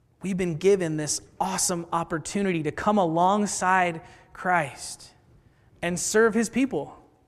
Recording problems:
none

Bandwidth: 14.5 kHz